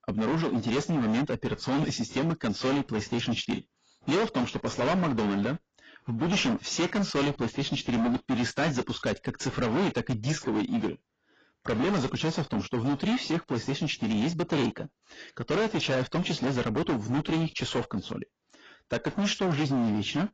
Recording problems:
distortion; heavy; 21% of the sound clipped
garbled, watery; badly; nothing above 7.5 kHz

